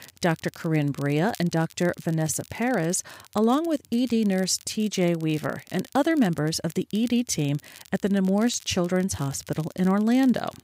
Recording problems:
crackle, like an old record; faint; 25 dB below the speech

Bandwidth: 15.5 kHz